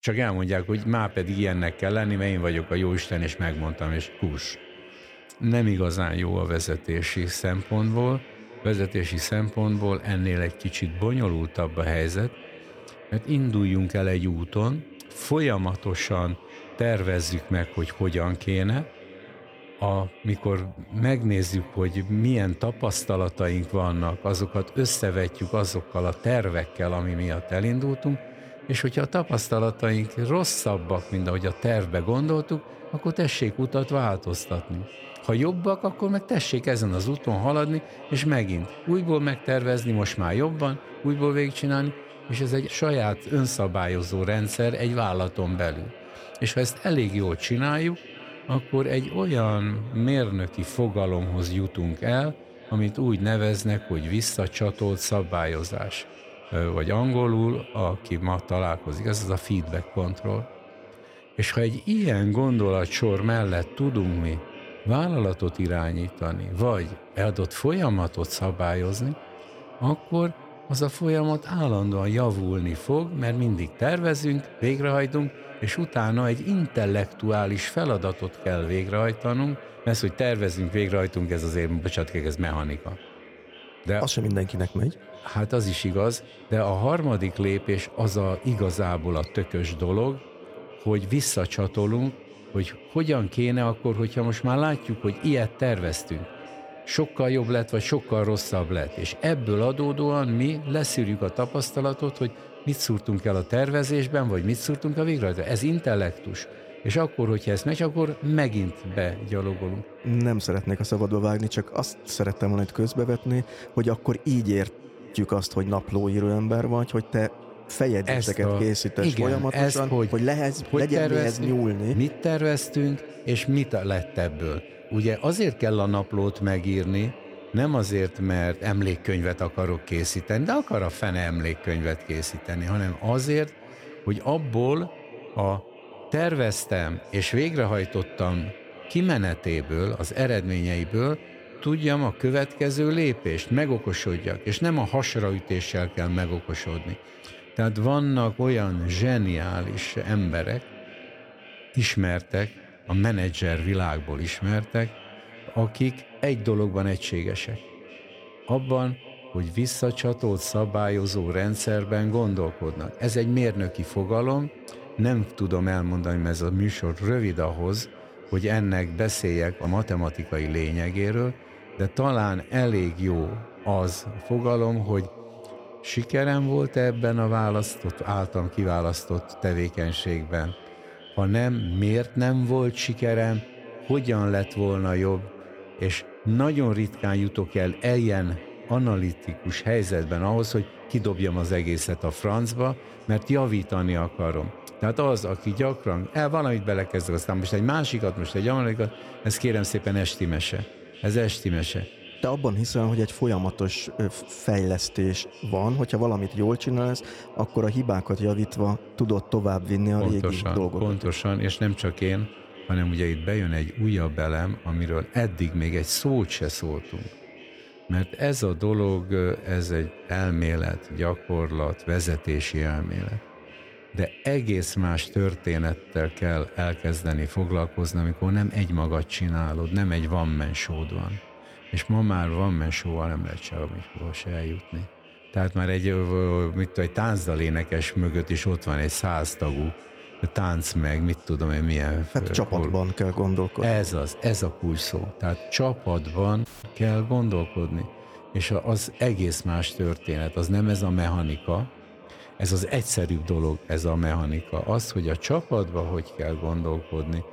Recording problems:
echo of what is said; noticeable; throughout; 530 ms later, 20 dB below the speech
audio cutting out; at 4:06

